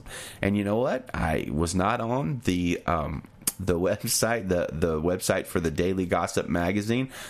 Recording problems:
squashed, flat; somewhat

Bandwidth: 14.5 kHz